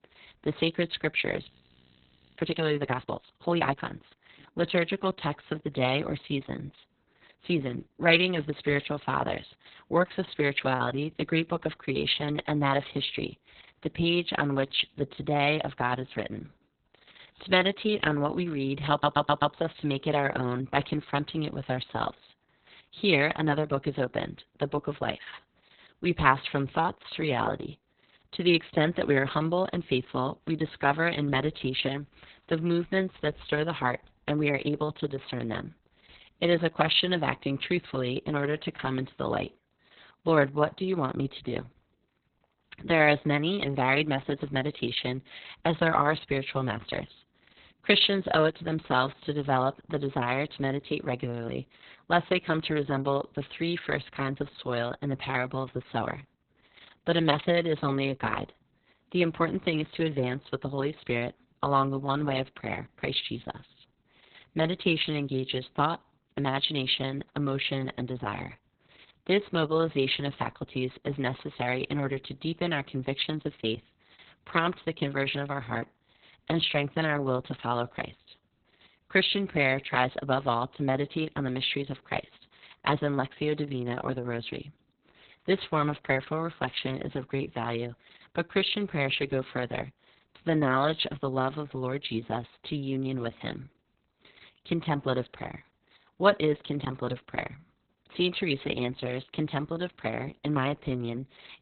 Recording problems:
garbled, watery; badly; nothing above 4 kHz
audio freezing; at 1.5 s for 1 s
audio stuttering; at 19 s
choppy; occasionally; at 1:14 and from 1:36 to 1:37; 2% of the speech affected

